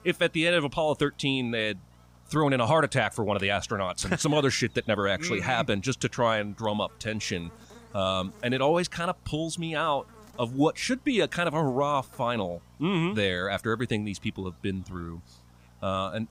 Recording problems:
electrical hum; faint; throughout; 60 Hz, 30 dB below the speech

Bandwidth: 15.5 kHz